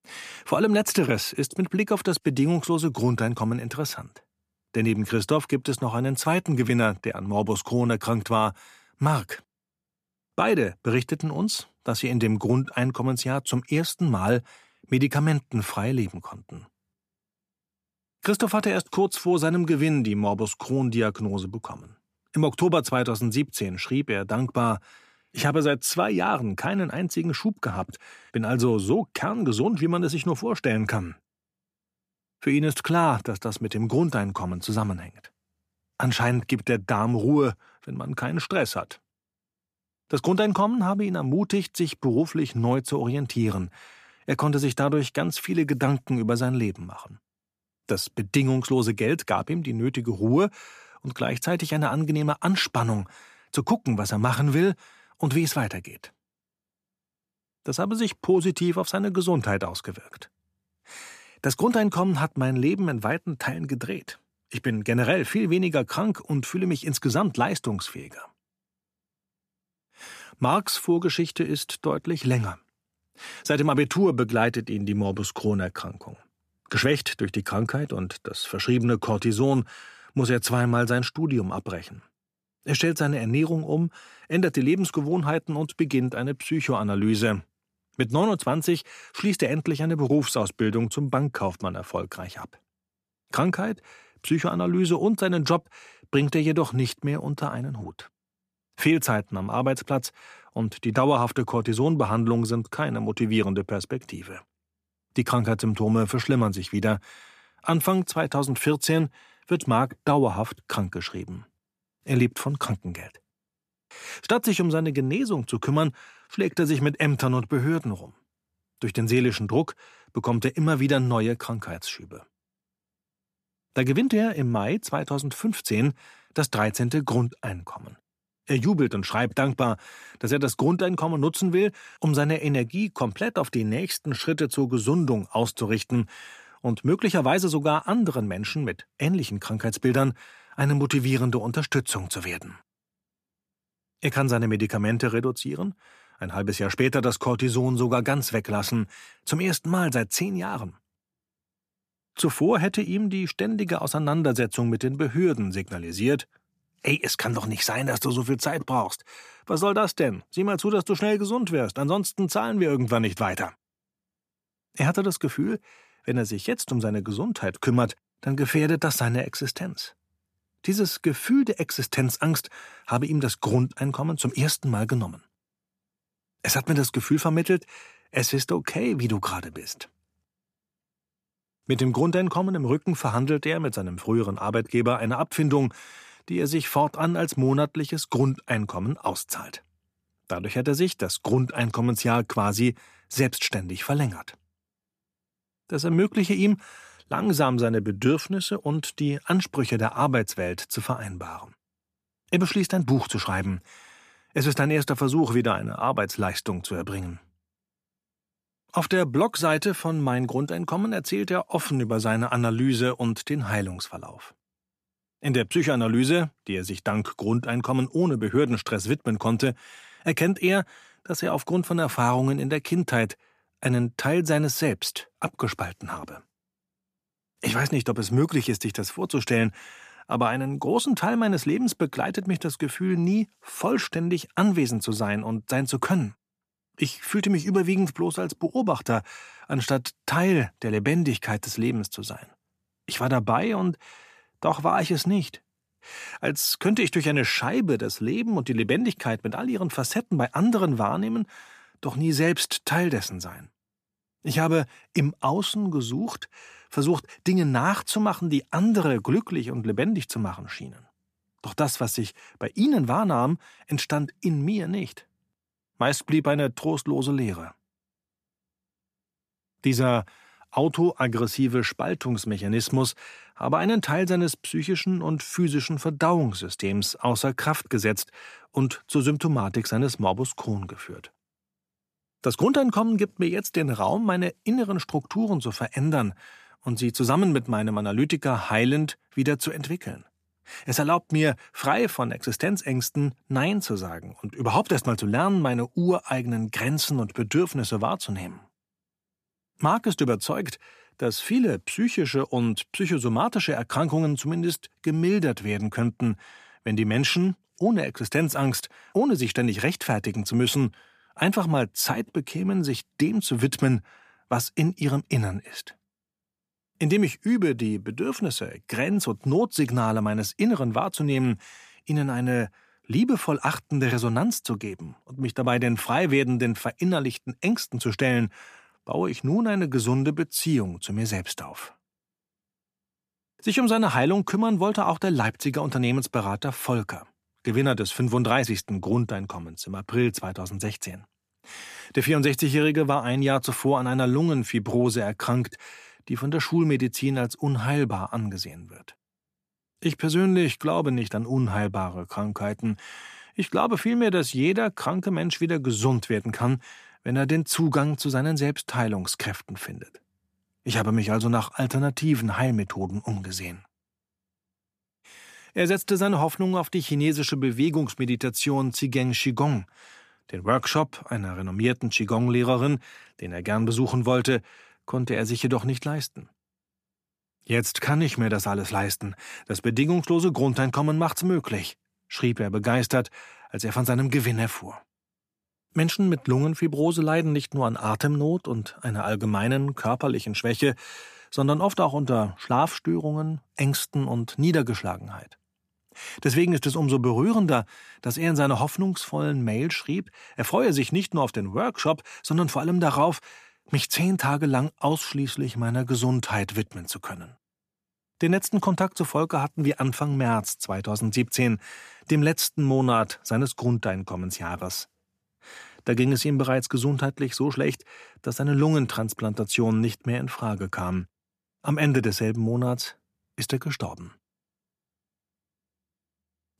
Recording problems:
none

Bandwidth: 14.5 kHz